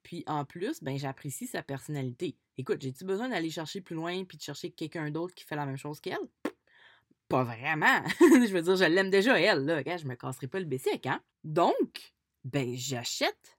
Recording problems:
none

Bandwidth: 16.5 kHz